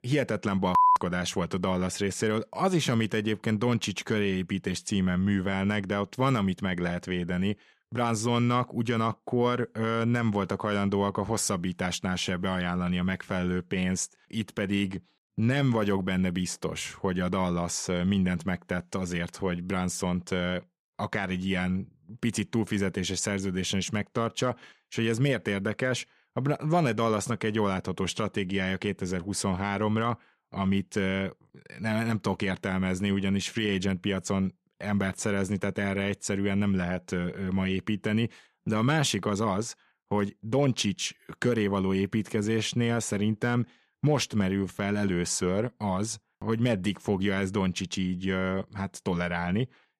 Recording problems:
none

